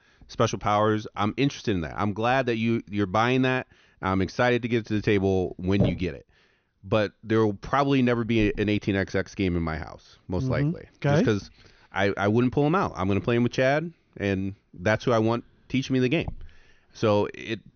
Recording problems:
high frequencies cut off; noticeable; nothing above 6.5 kHz

